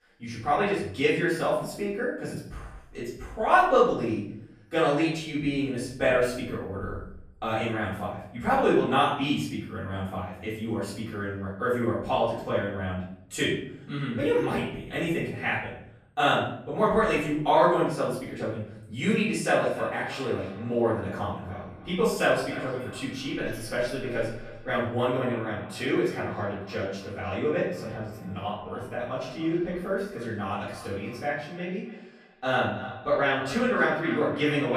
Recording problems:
off-mic speech; far
echo of what is said; noticeable; from 19 s on; 290 ms later, 15 dB below the speech
room echo; noticeable; dies away in 0.6 s
abrupt cut into speech; at the end

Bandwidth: 14.5 kHz